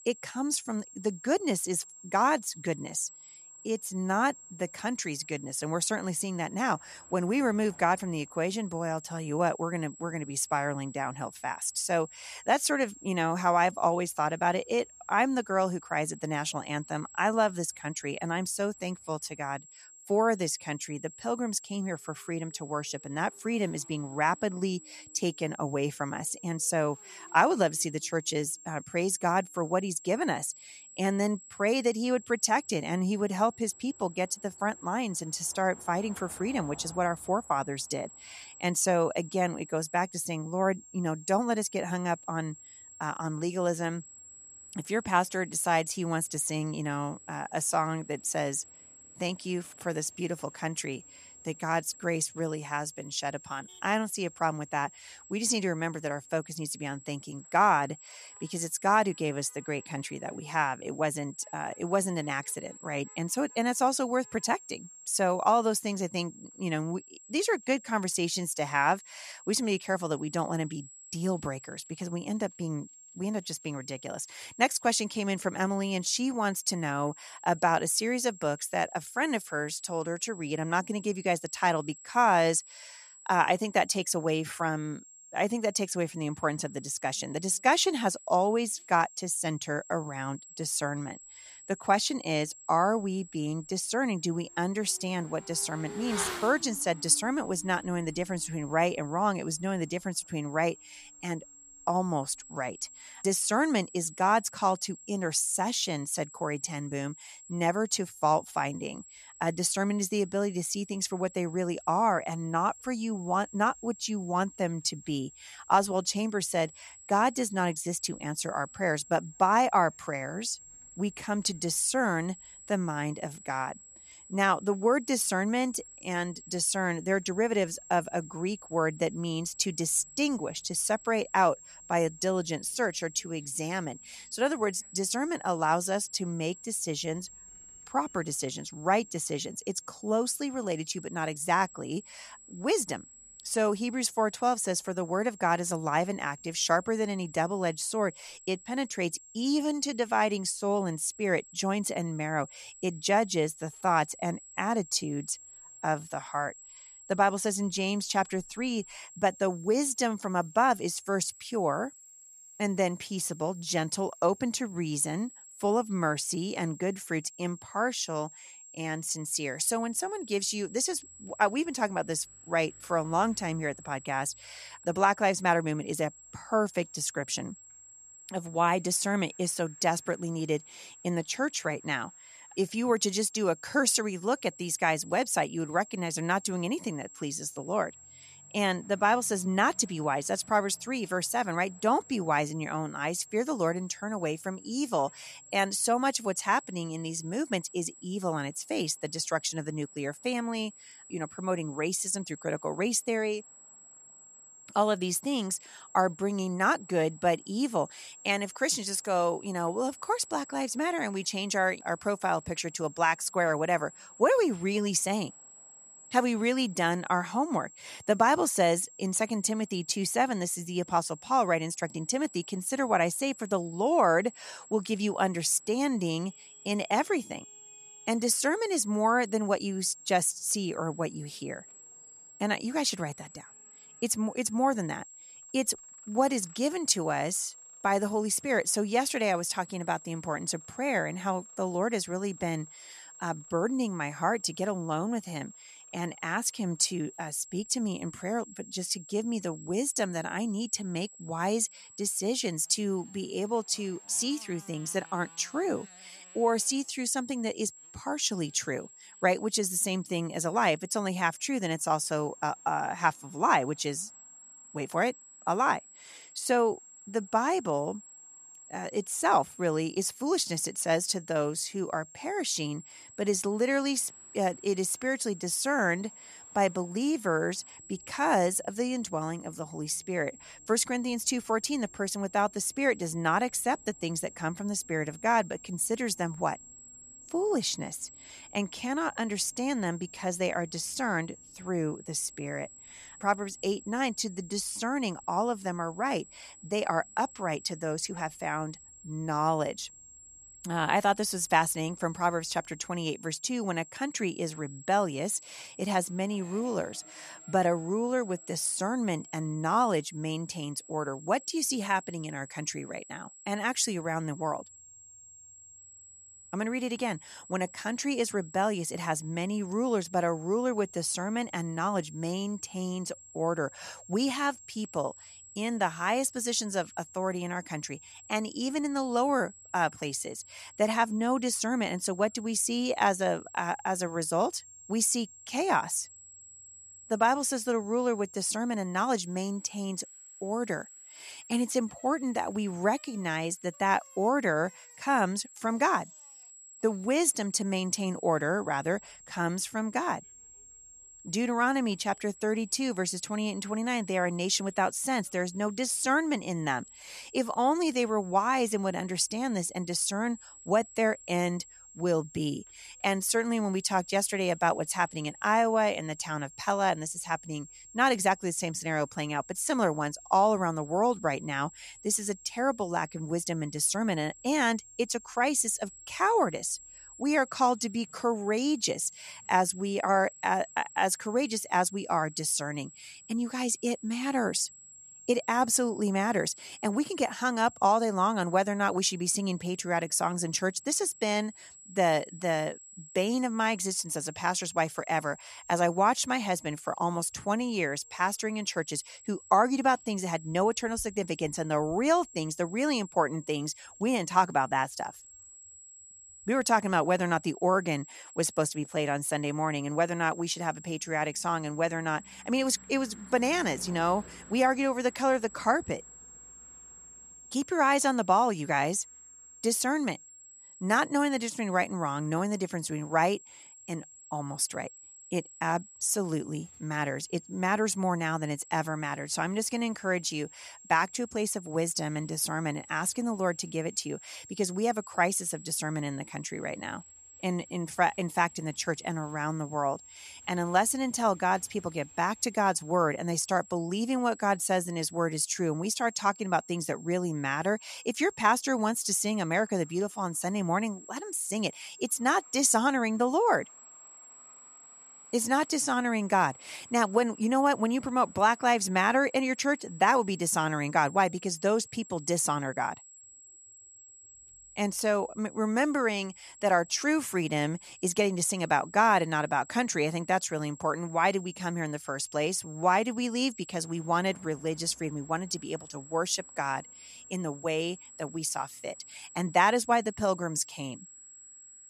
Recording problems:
high-pitched whine; noticeable; throughout; 7.5 kHz, 20 dB below the speech
traffic noise; faint; throughout; 30 dB below the speech

